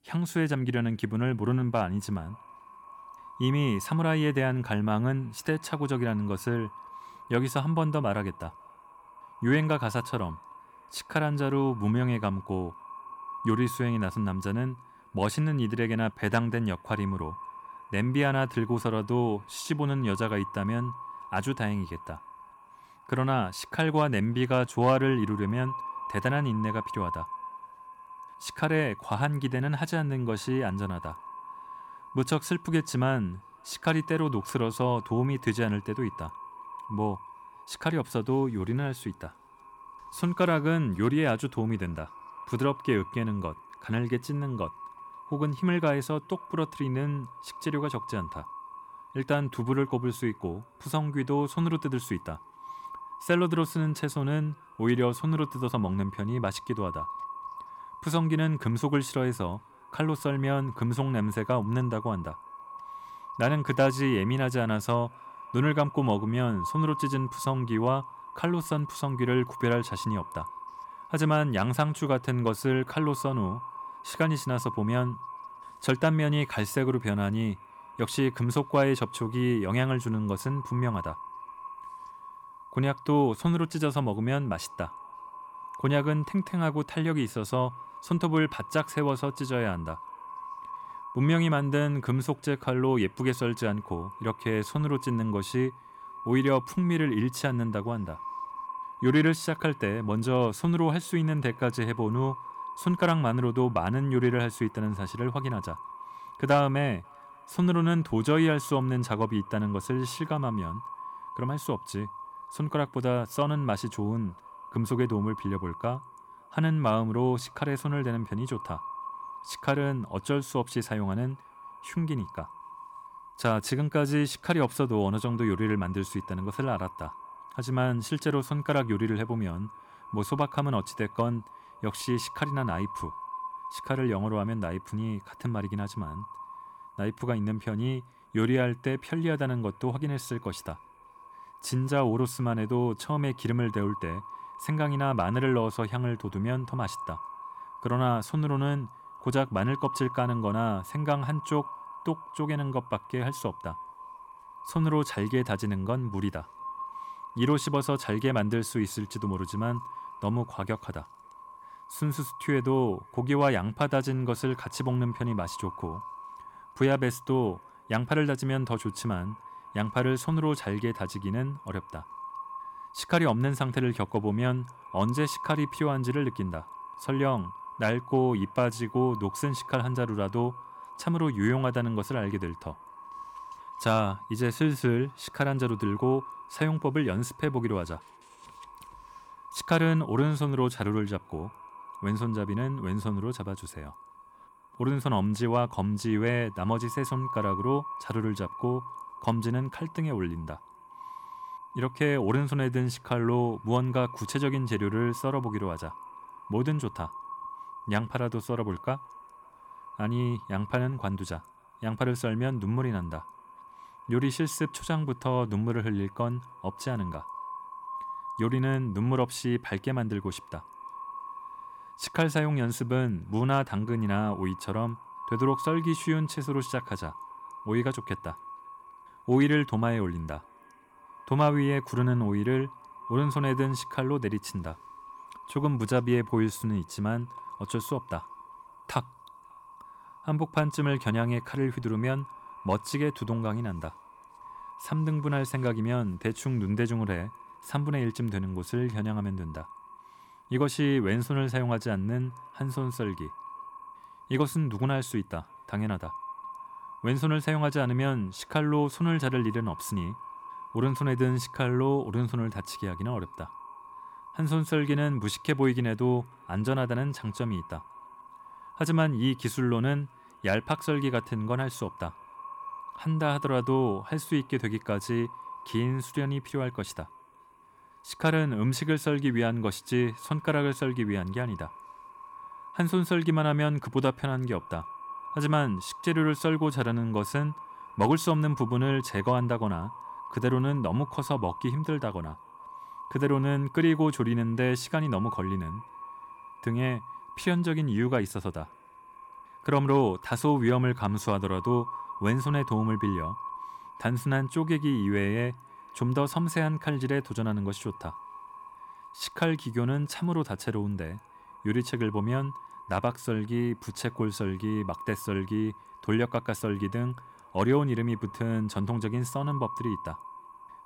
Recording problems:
echo of what is said; noticeable; throughout; 540 ms later, 15 dB below the speech

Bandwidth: 18 kHz